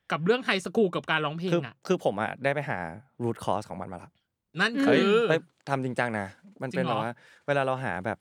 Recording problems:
none

